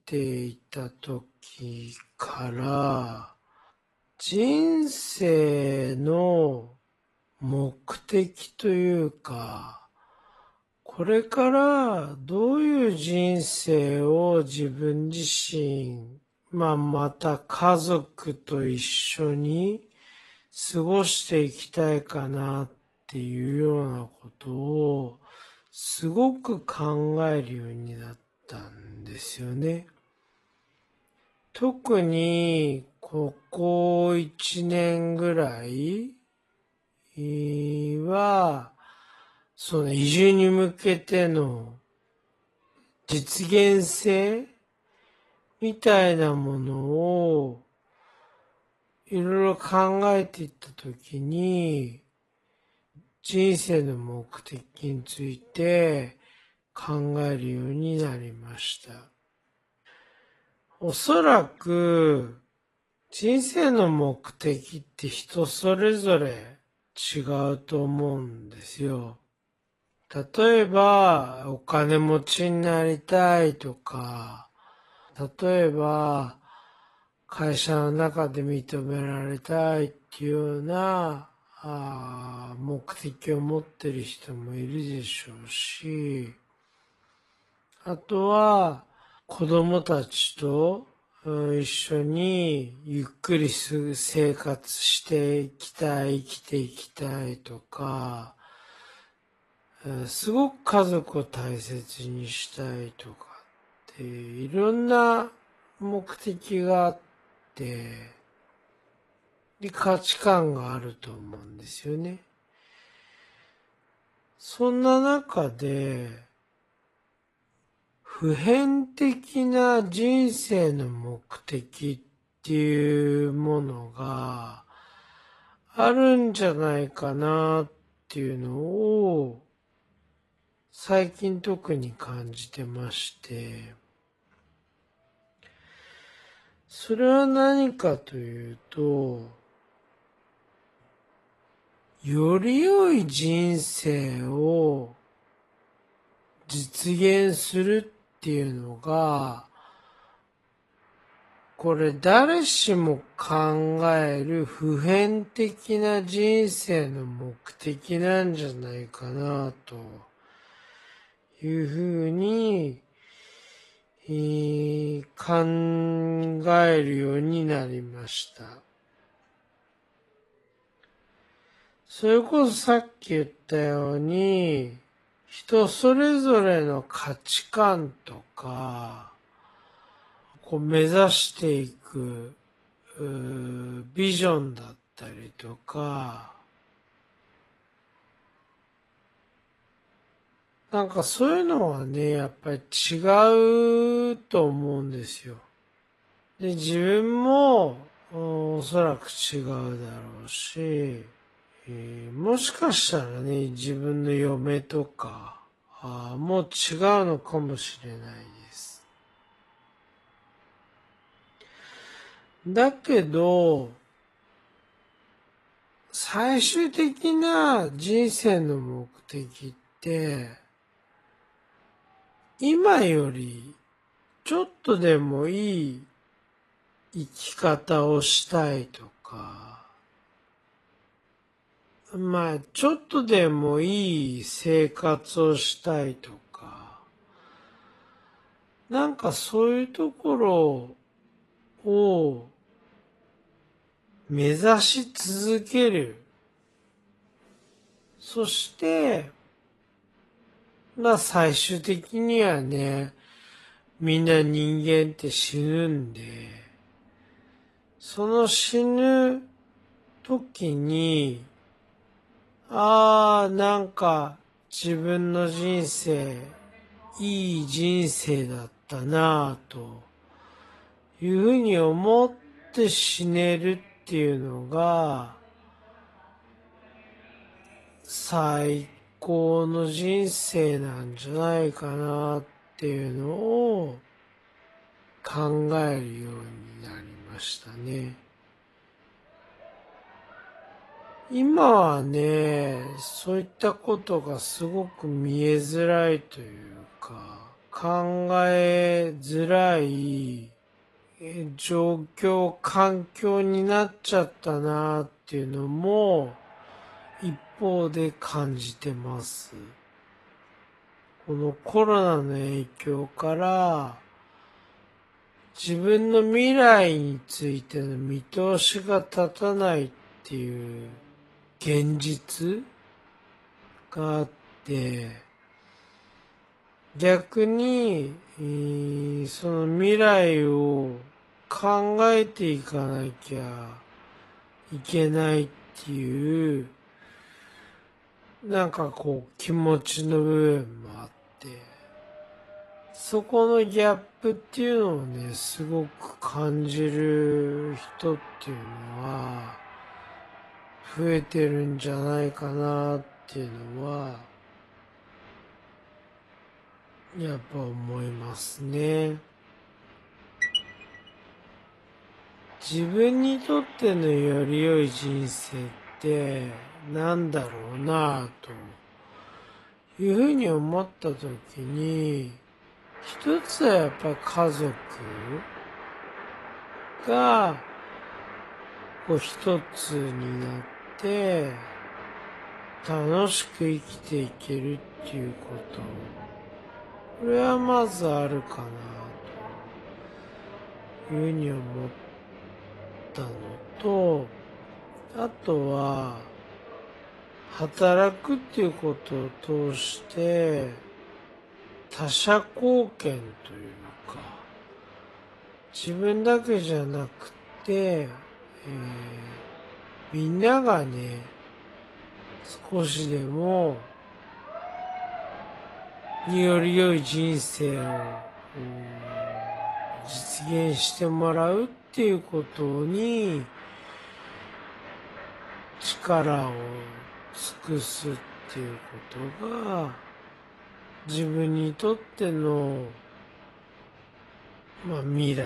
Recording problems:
wrong speed, natural pitch; too slow; 0.5 times normal speed
garbled, watery; slightly; nothing above 11.5 kHz
crowd noise; faint; throughout; 20 dB below the speech
abrupt cut into speech; at the end

